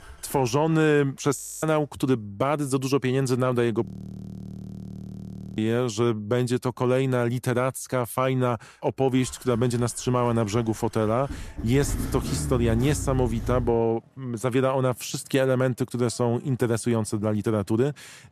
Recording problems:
traffic noise; noticeable; throughout; 10 dB below the speech
audio freezing; at 1.5 s and at 4 s for 1.5 s

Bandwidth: 14 kHz